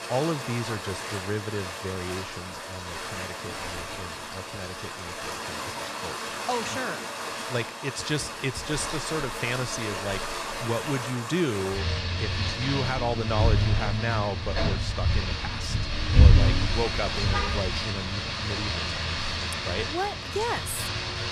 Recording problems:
rain or running water; very loud; throughout; 3 dB above the speech

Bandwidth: 15 kHz